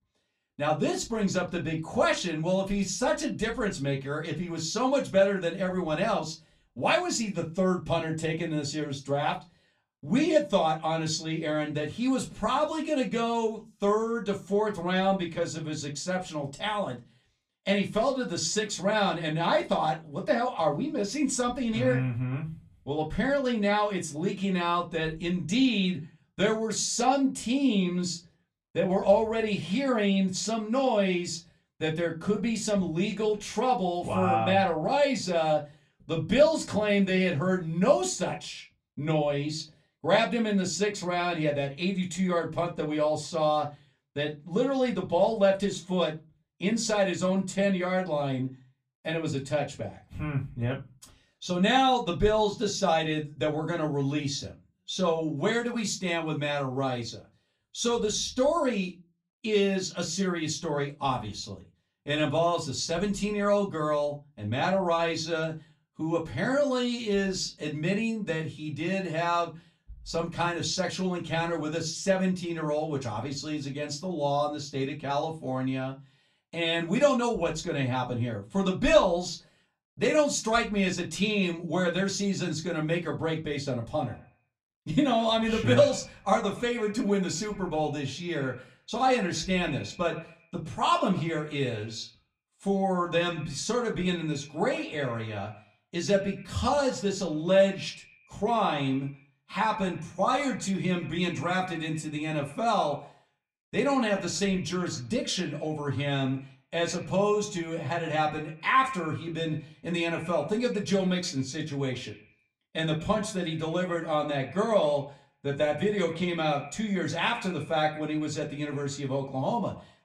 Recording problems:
off-mic speech; far
echo of what is said; noticeable; from 1:24 on; 120 ms later, 15 dB below the speech
room echo; very slight; dies away in 0.2 s

